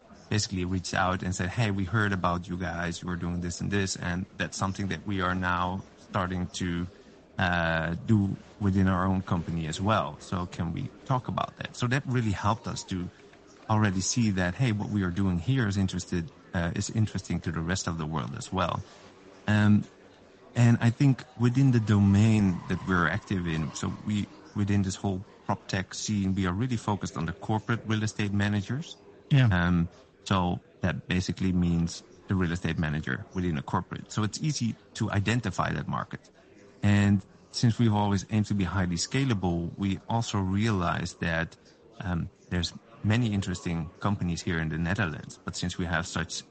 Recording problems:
garbled, watery; slightly; nothing above 8 kHz
murmuring crowd; faint; throughout; 25 dB below the speech

